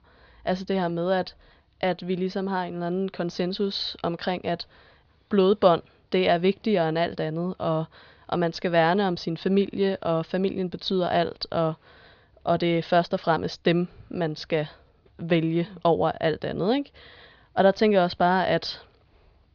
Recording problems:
muffled; slightly; fading above 4.5 kHz
high frequencies cut off; slight; nothing above 6.5 kHz

